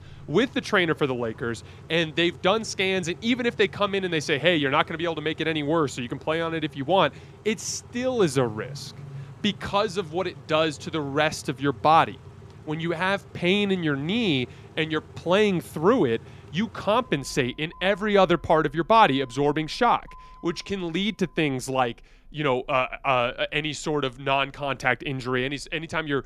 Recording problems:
traffic noise; faint; throughout; 20 dB below the speech

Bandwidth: 14.5 kHz